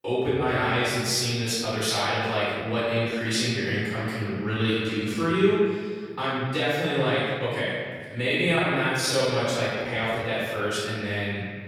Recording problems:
room echo; strong; dies away in 1.9 s
off-mic speech; far
uneven, jittery; strongly; from 1.5 to 11 s

